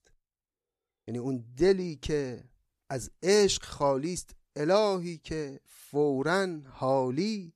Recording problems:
none

